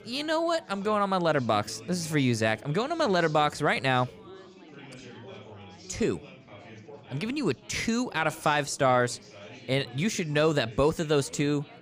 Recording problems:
chatter from many people; faint; throughout; 20 dB below the speech

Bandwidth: 15 kHz